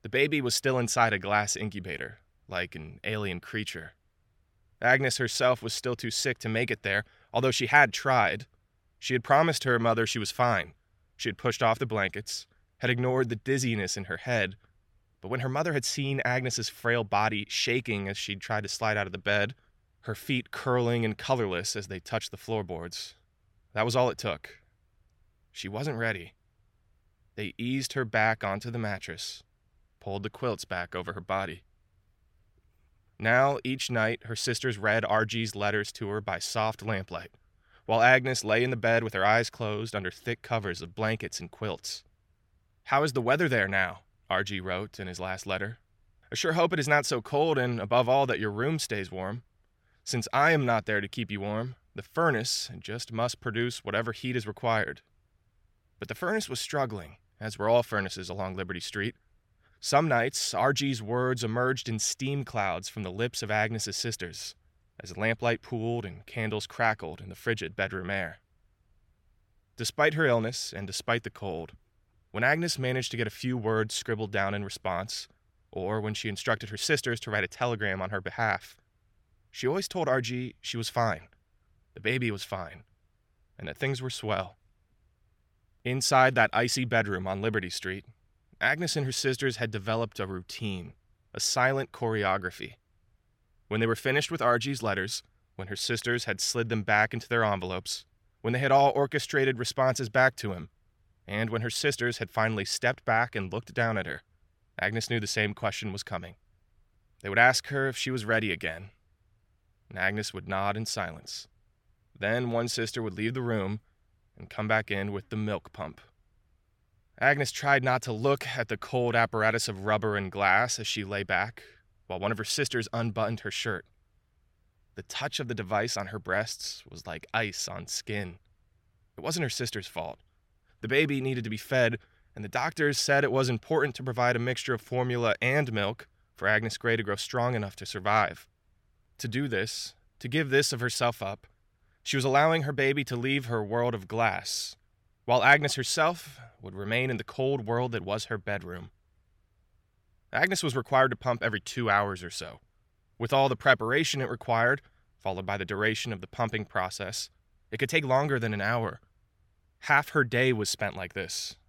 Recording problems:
none

